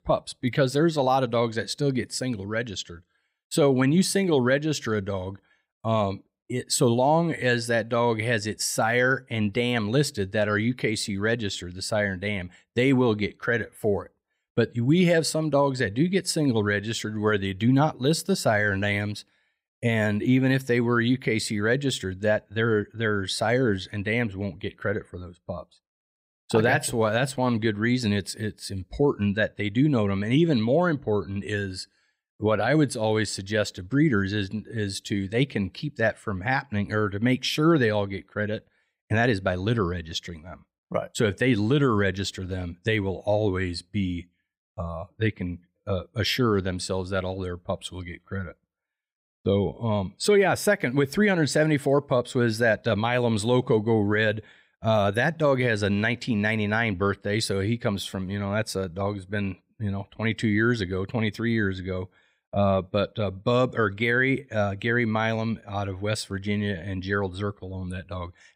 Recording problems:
none

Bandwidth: 15.5 kHz